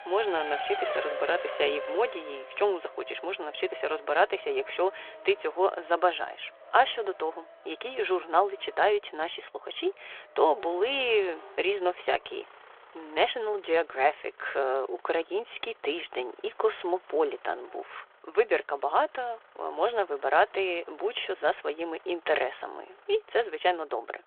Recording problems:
phone-call audio
traffic noise; noticeable; throughout; 10 dB below the speech

